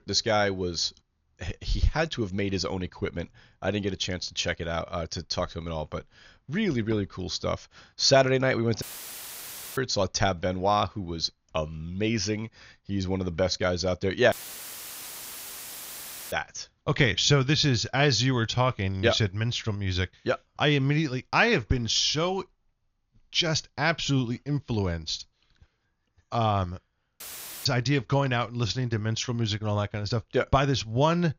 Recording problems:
high frequencies cut off; noticeable; nothing above 7 kHz
audio cutting out; filled with static; at 9 s for 1 s, at 14 s for 2 s and at 27 s

